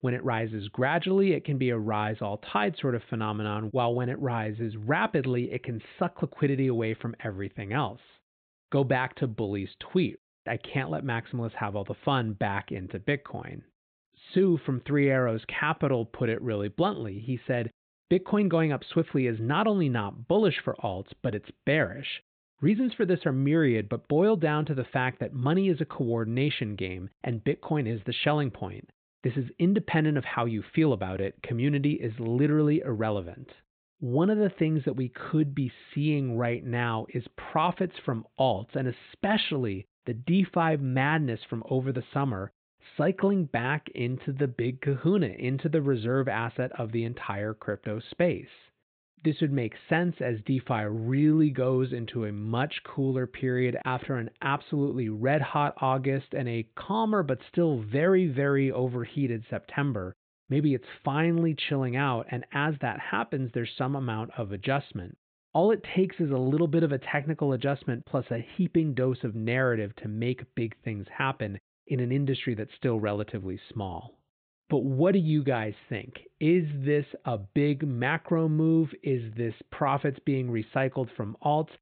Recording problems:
high frequencies cut off; severe; nothing above 4 kHz

